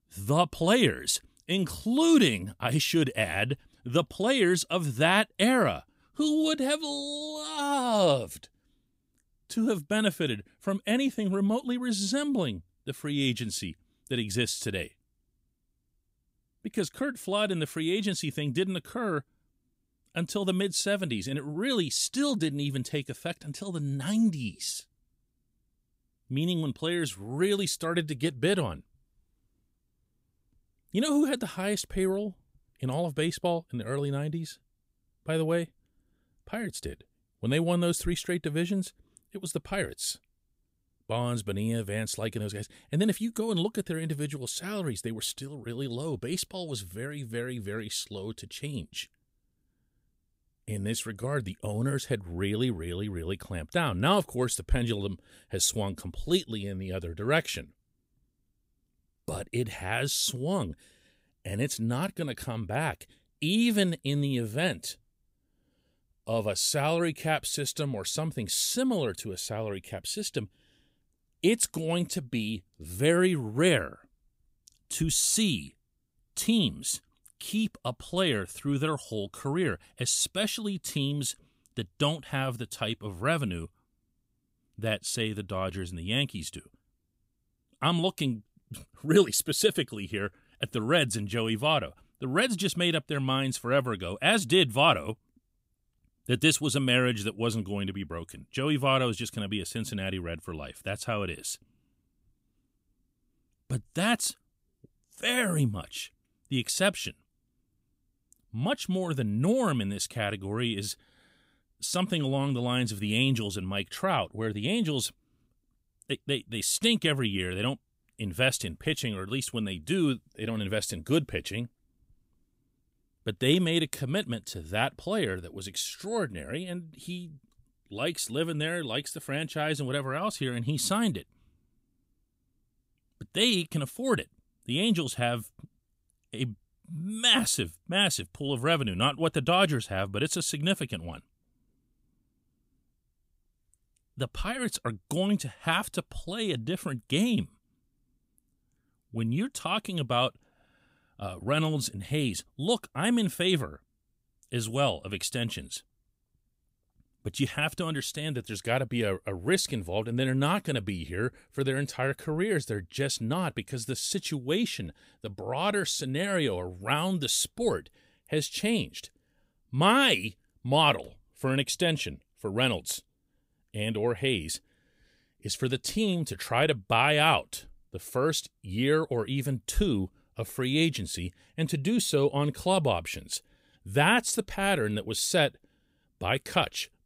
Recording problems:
none

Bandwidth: 15.5 kHz